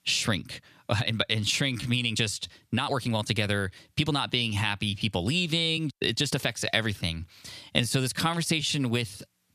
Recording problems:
squashed, flat; somewhat
uneven, jittery; strongly; from 1 to 9 s

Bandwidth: 14.5 kHz